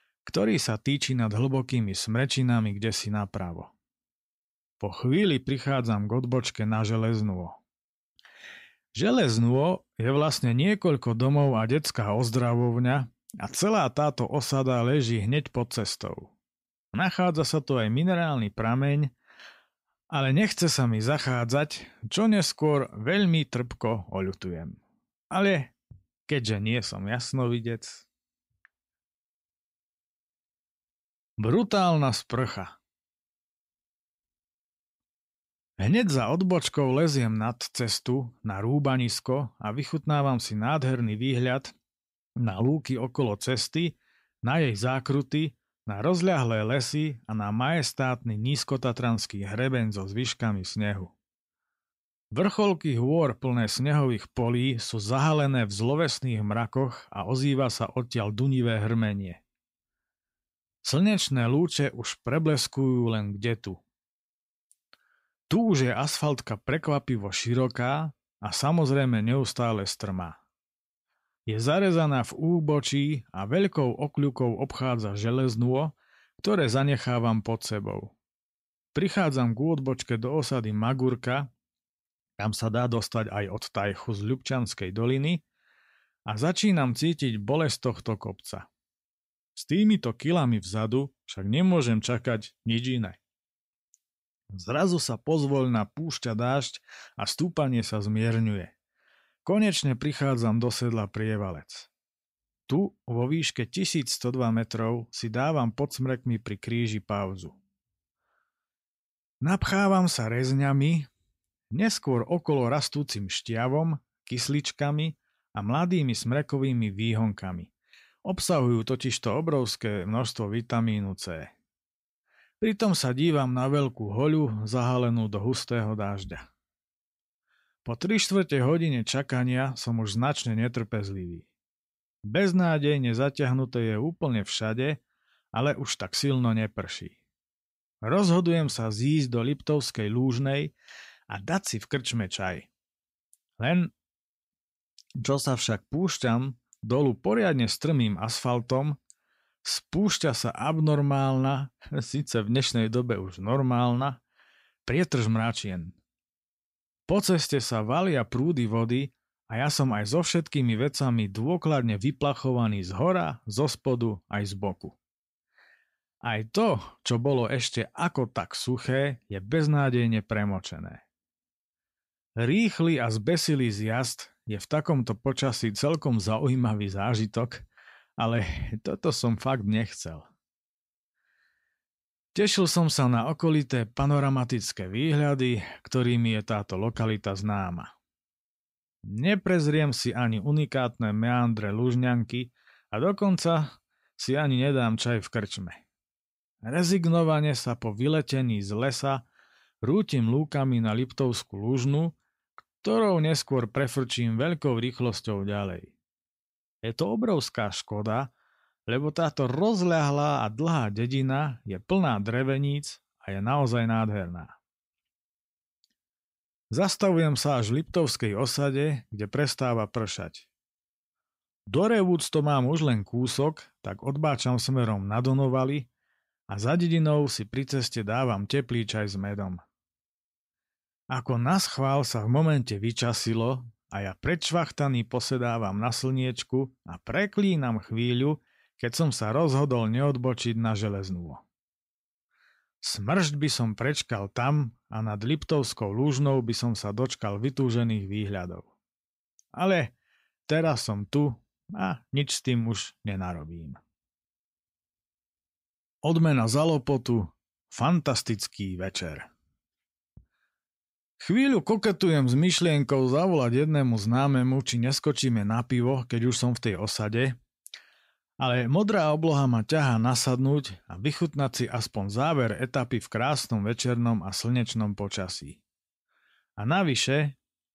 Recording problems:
none

